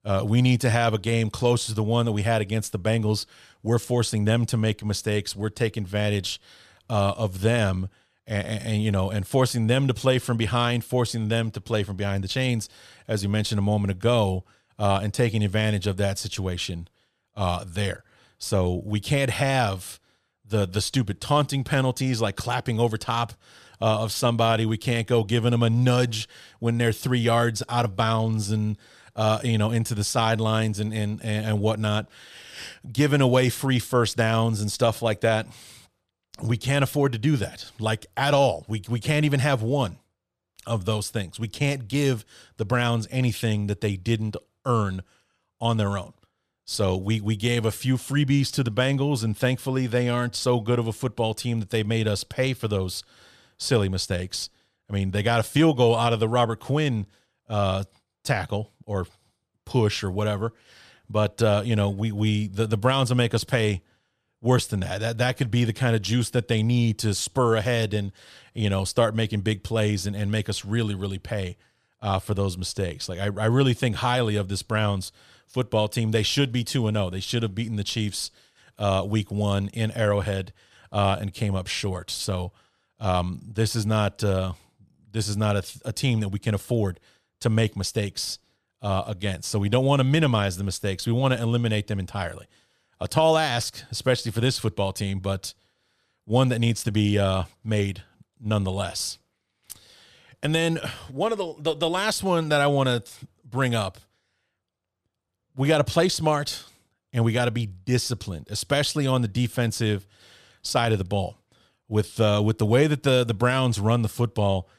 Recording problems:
none

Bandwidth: 14.5 kHz